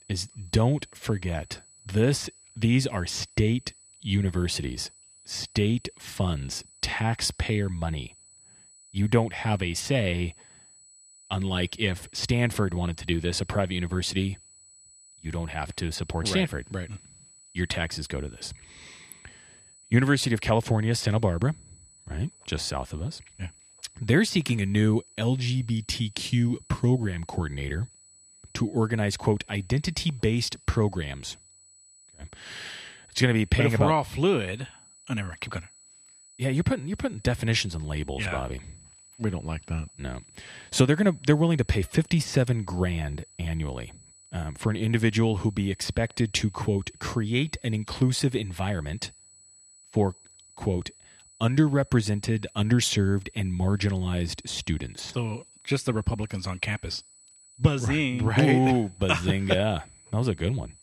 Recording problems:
high-pitched whine; faint; throughout; 8 kHz, 25 dB below the speech

